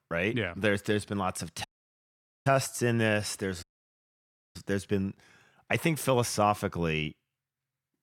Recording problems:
audio cutting out; at 1.5 s for 1 s and at 3.5 s for 1 s

